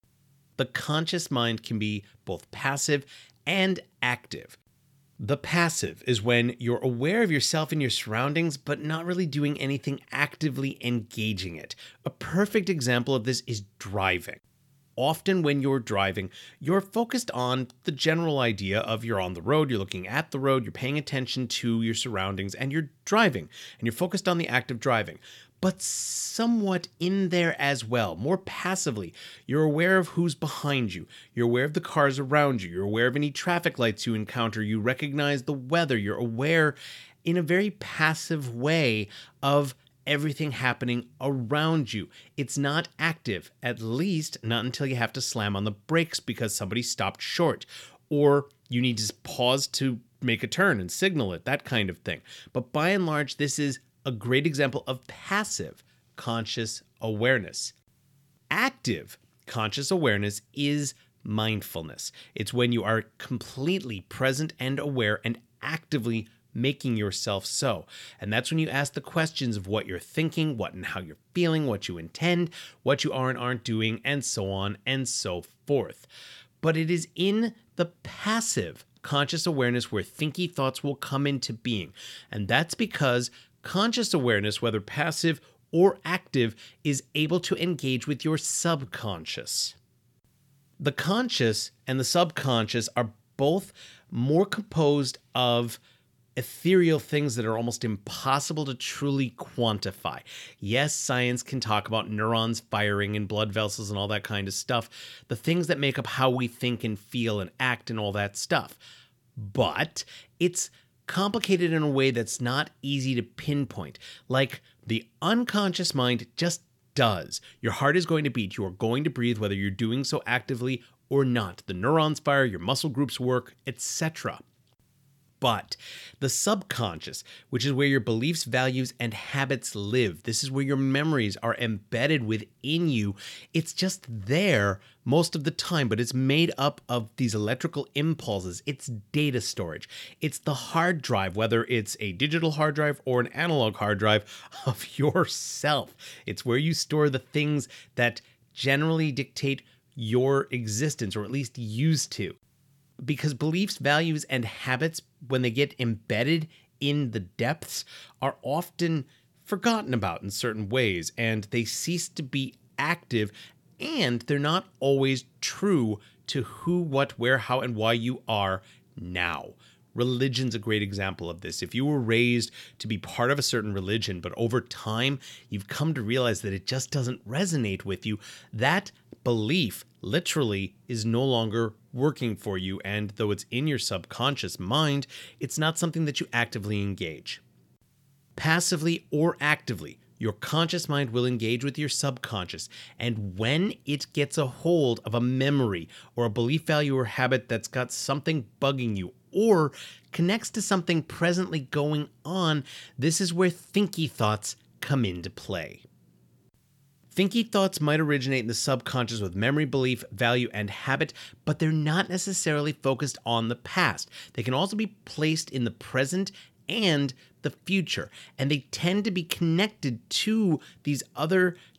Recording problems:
none

